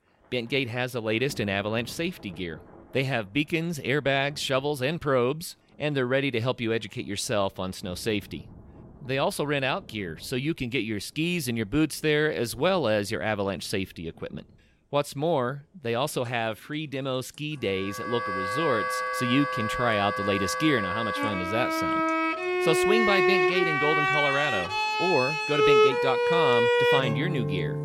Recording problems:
background music; very loud; from 18 s on; 3 dB above the speech
rain or running water; faint; throughout; 25 dB below the speech

